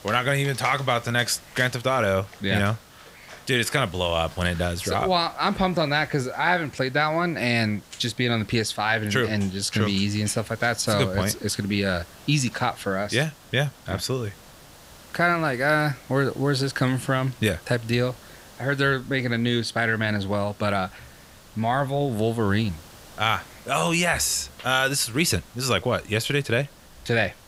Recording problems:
animal sounds; faint; throughout; 25 dB below the speech
hiss; faint; throughout; 25 dB below the speech

